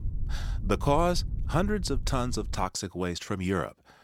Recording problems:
low rumble; faint; until 2.5 s; 20 dB below the speech

